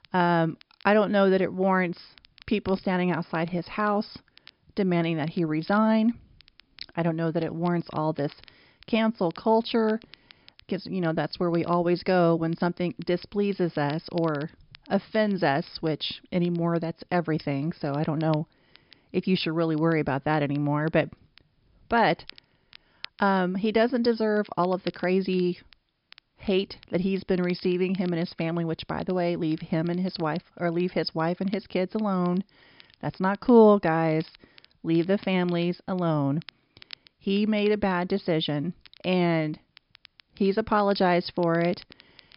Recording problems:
high frequencies cut off; noticeable; nothing above 5.5 kHz
crackle, like an old record; faint; 25 dB below the speech

